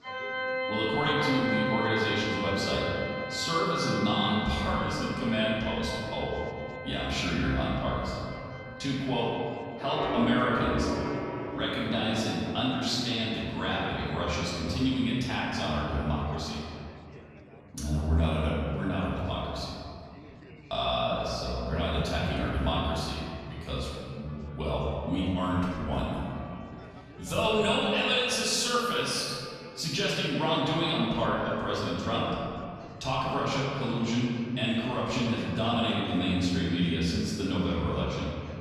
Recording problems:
room echo; strong; dies away in 2.2 s
off-mic speech; far
background music; loud; throughout; 6 dB below the speech
chatter from many people; faint; throughout; 20 dB below the speech

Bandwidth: 13.5 kHz